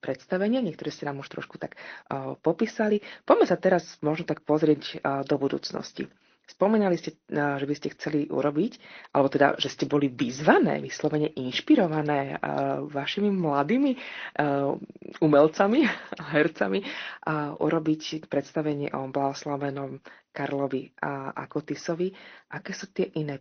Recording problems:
high frequencies cut off; noticeable; nothing above 6 kHz
garbled, watery; slightly

